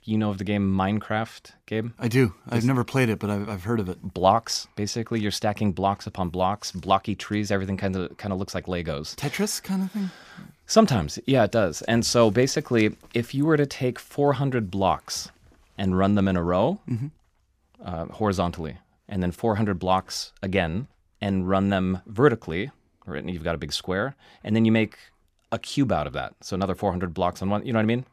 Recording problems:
none

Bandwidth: 15 kHz